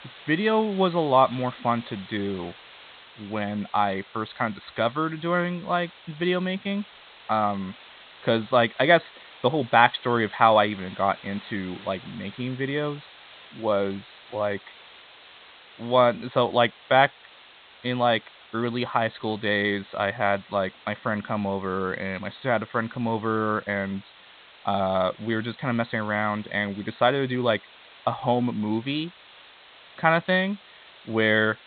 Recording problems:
high frequencies cut off; severe; nothing above 4 kHz
hiss; faint; throughout; 20 dB below the speech

